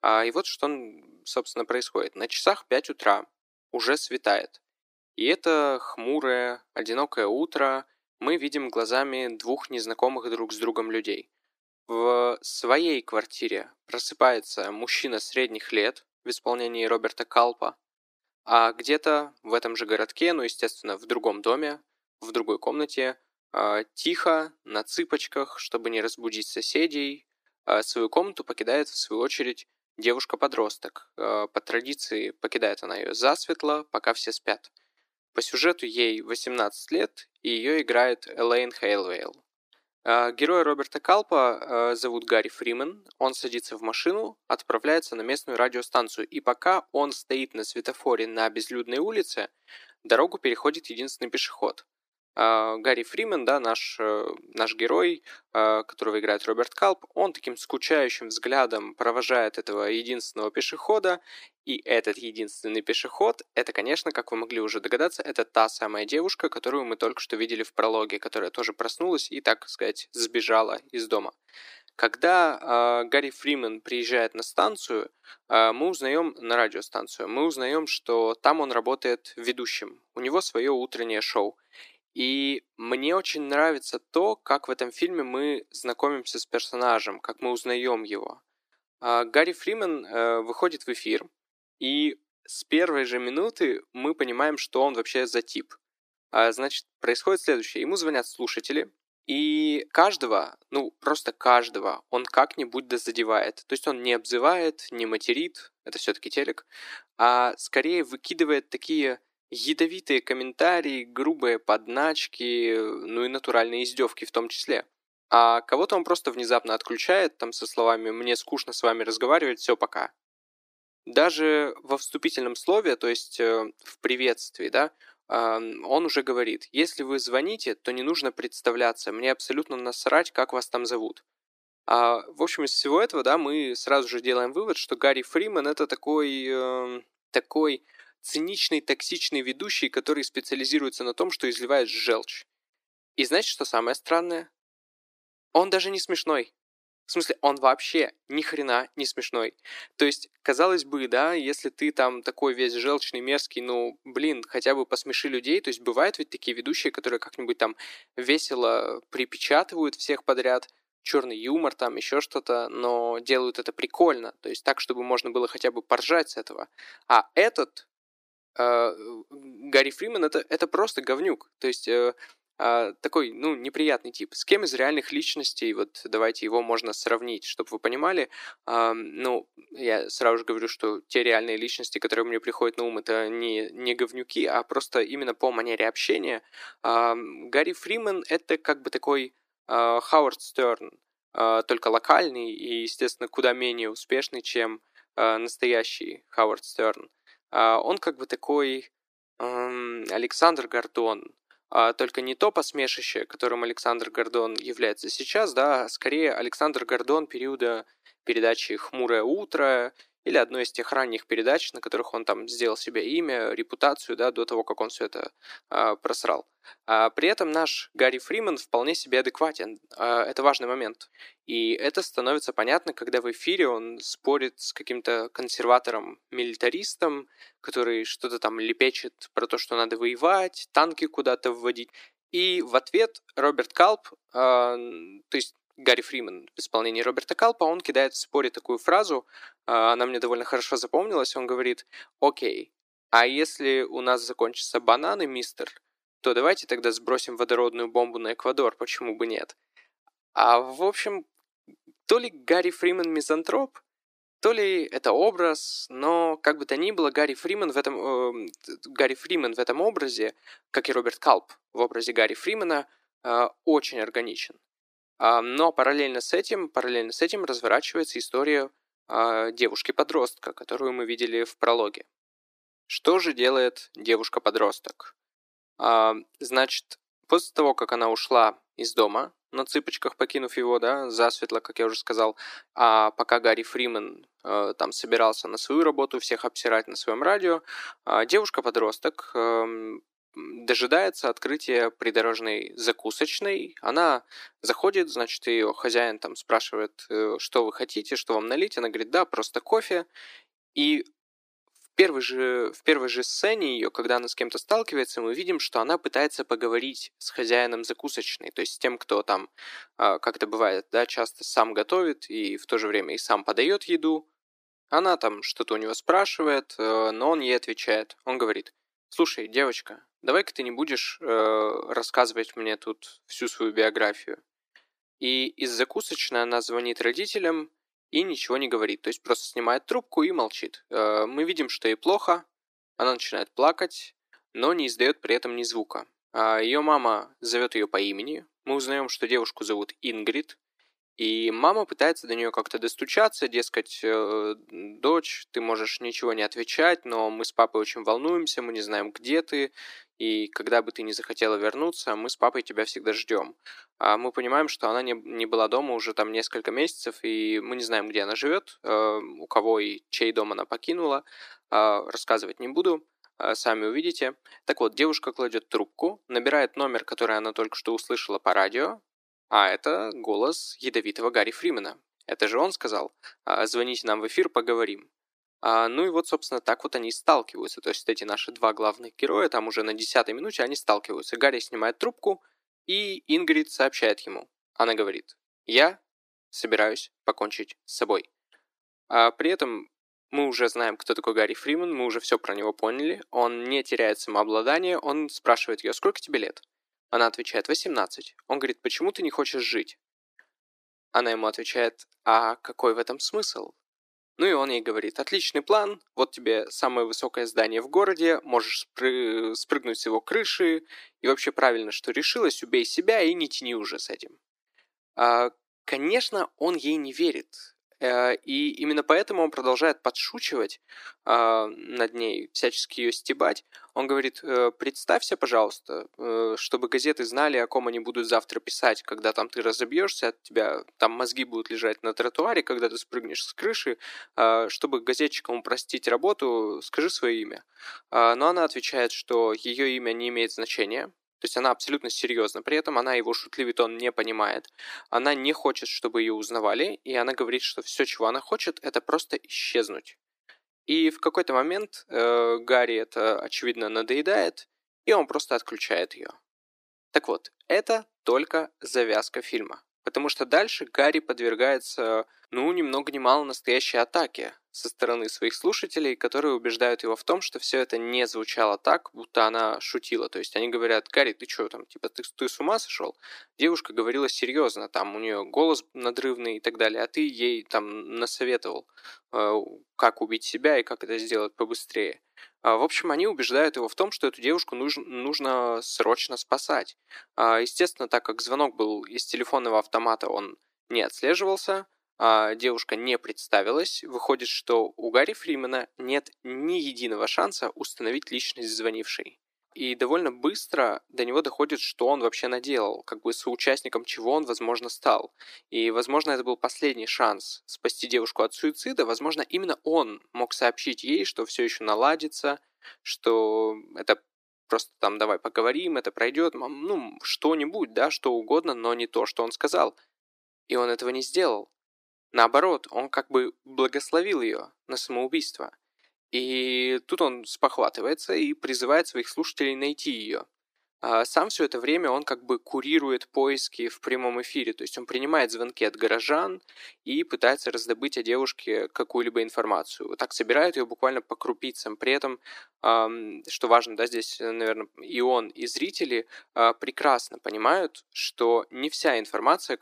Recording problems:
thin; somewhat; fading below 300 Hz

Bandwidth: 15 kHz